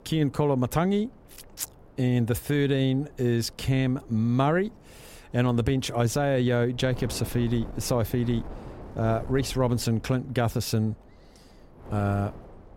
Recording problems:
wind noise on the microphone; occasional gusts; 20 dB below the speech

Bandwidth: 16 kHz